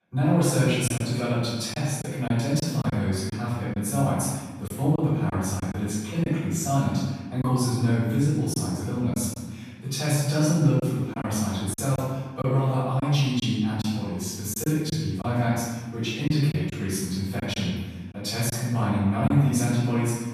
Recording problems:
room echo; strong; dies away in 1.3 s
off-mic speech; far
choppy; occasionally; 5% of the speech affected

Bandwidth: 14.5 kHz